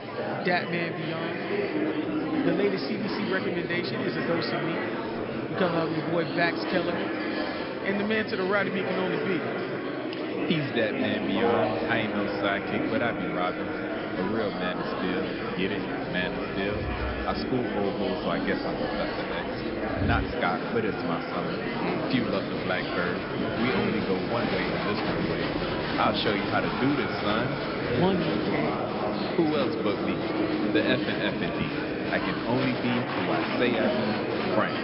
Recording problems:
echo of what is said; strong; throughout; 220 ms later, 6 dB below the speech
high frequencies cut off; noticeable; nothing above 5.5 kHz
murmuring crowd; loud; throughout; as loud as the speech

